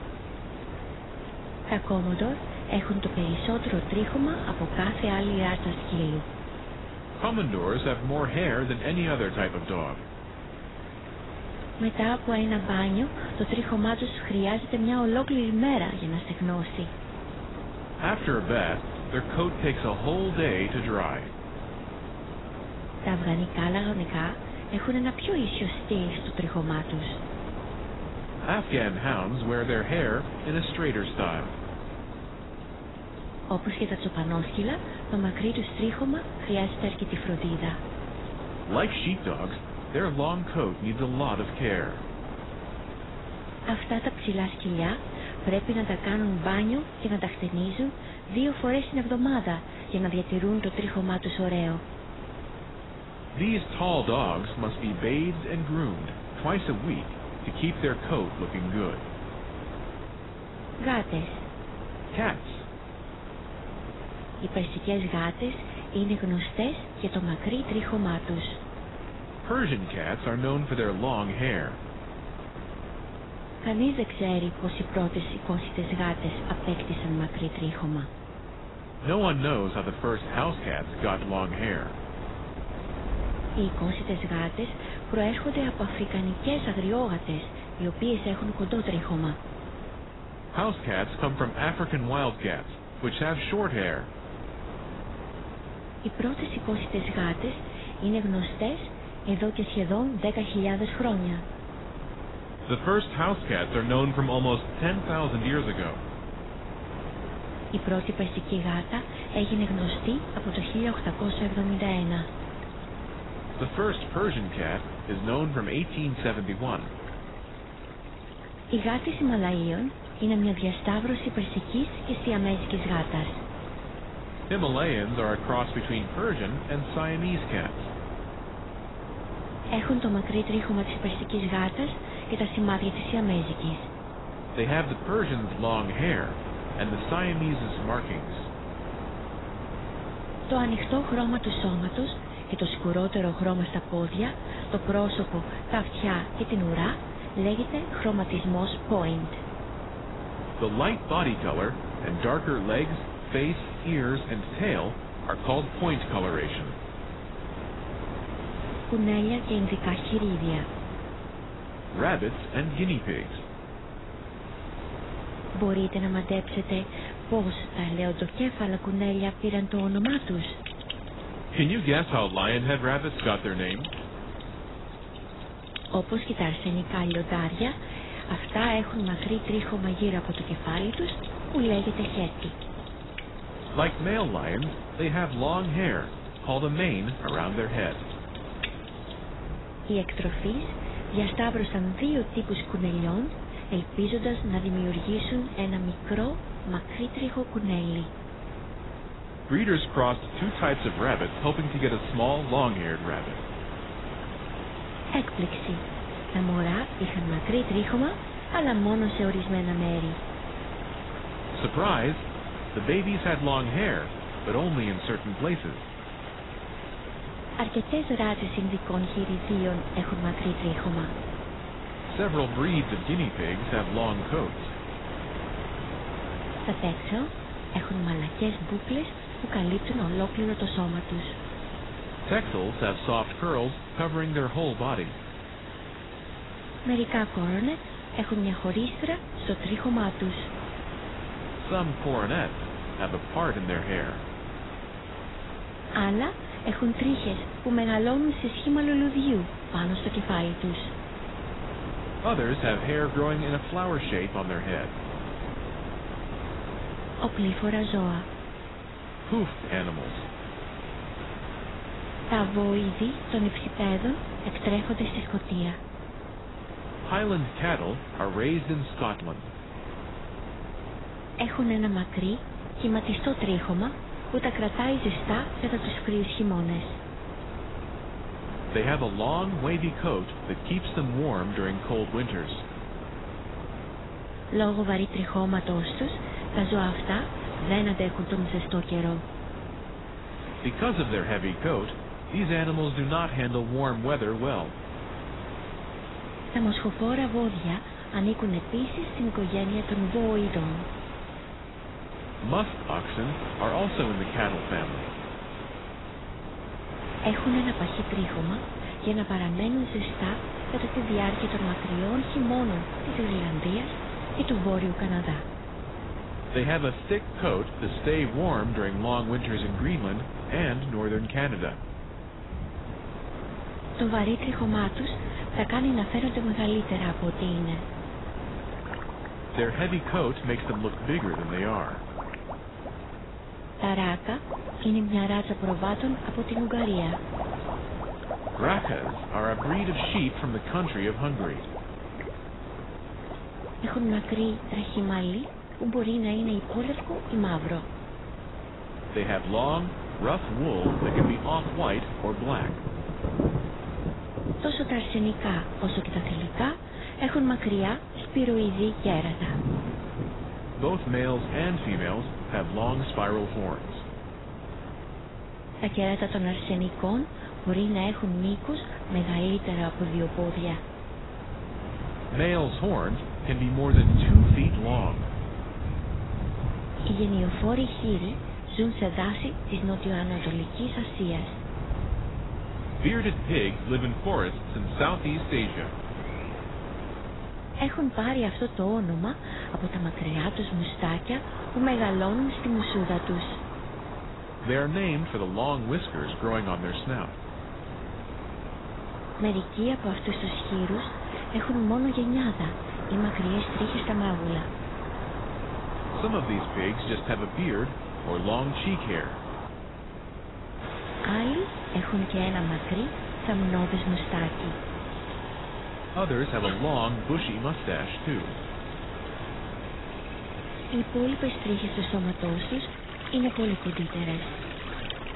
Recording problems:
garbled, watery; badly; nothing above 4 kHz
wind noise on the microphone; heavy; 10 dB below the speech
rain or running water; noticeable; throughout; 10 dB below the speech

